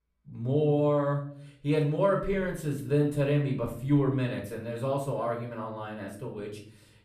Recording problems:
off-mic speech; far
room echo; slight; dies away in 0.6 s

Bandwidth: 14.5 kHz